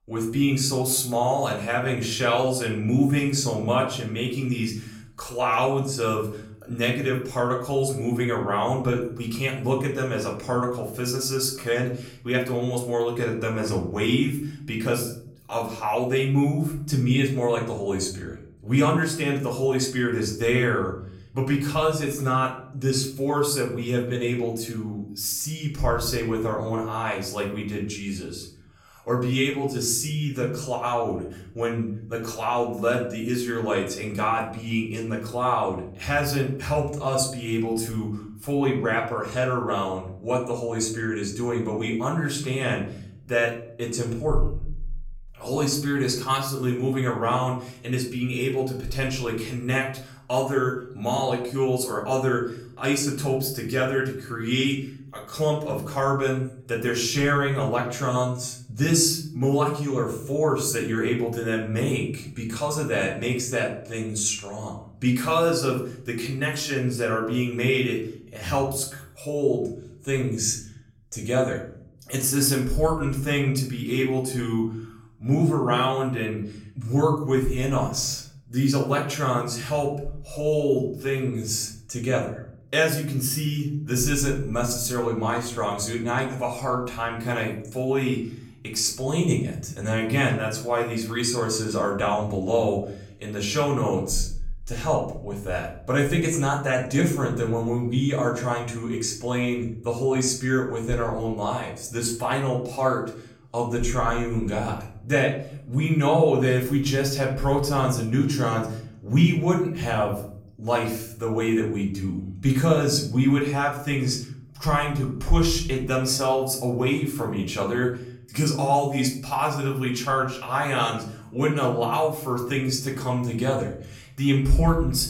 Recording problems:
off-mic speech; far
room echo; slight; dies away in 0.7 s

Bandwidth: 16.5 kHz